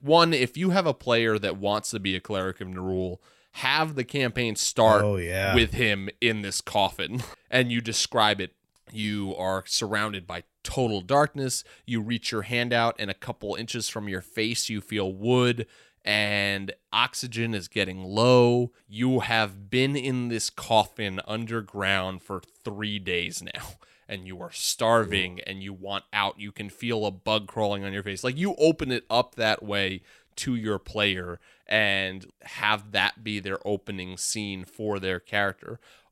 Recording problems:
none

